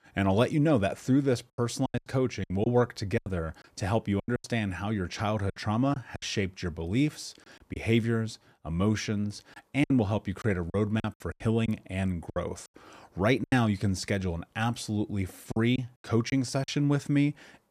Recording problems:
choppy; very; 9% of the speech affected

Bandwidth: 14.5 kHz